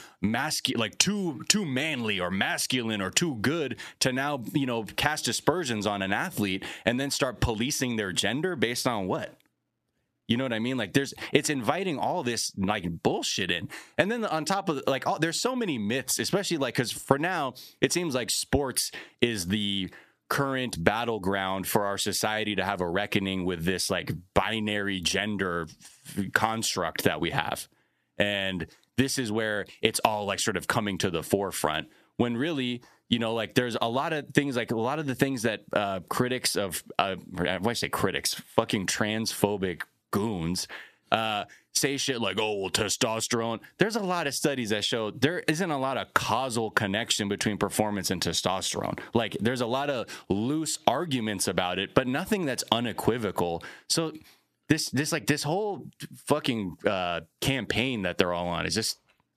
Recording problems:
squashed, flat; heavily

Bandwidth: 14.5 kHz